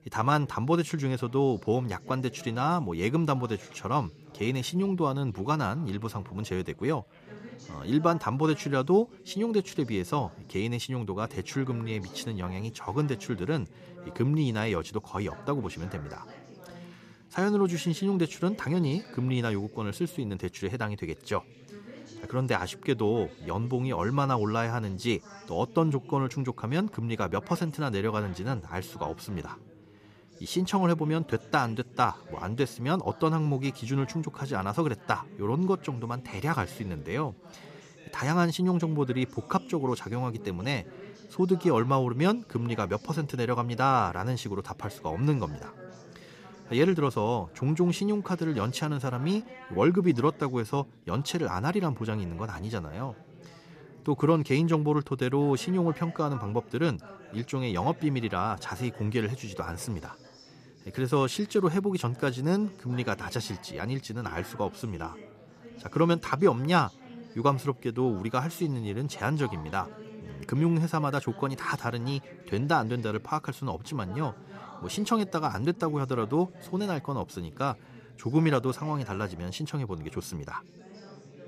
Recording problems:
background chatter; noticeable; throughout; 4 voices, 20 dB below the speech

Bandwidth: 14.5 kHz